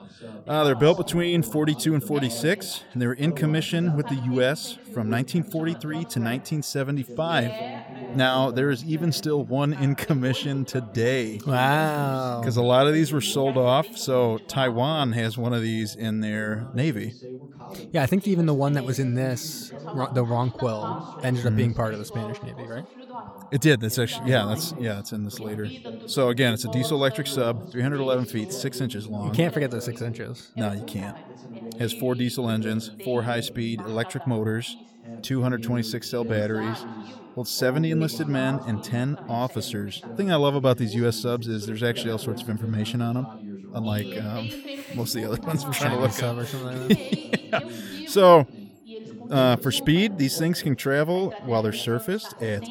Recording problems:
background chatter; noticeable; throughout; 2 voices, 15 dB below the speech

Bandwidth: 17.5 kHz